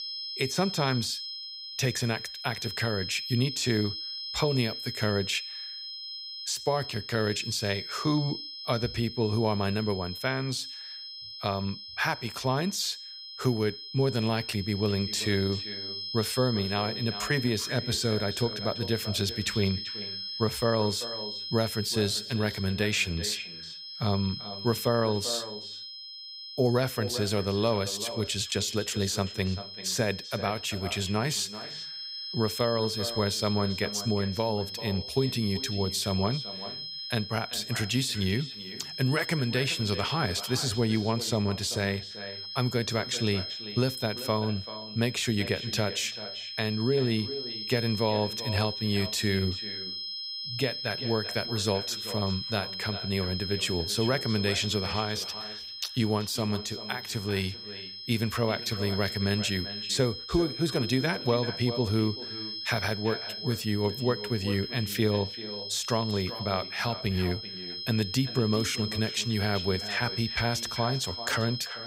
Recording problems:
echo of what is said; noticeable; from 15 s on; 390 ms later, 15 dB below the speech
high-pitched whine; loud; throughout; 5 kHz, 6 dB below the speech

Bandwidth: 15.5 kHz